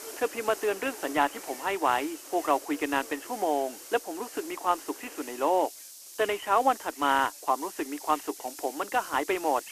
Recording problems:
phone-call audio; poor line; nothing above 4 kHz
hiss; noticeable; throughout; 15 dB below the speech
animal sounds; faint; throughout; 20 dB below the speech

